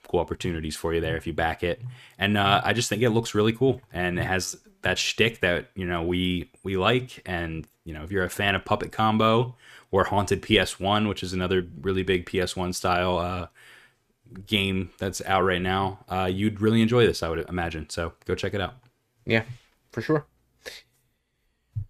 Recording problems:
none

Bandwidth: 14.5 kHz